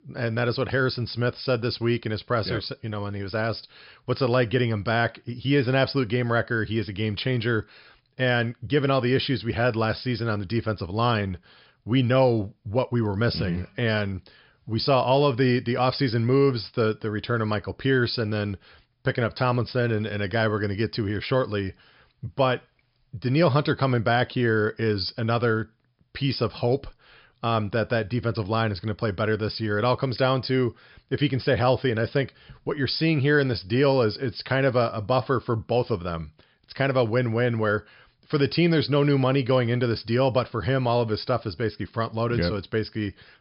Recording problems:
high frequencies cut off; noticeable; nothing above 5.5 kHz

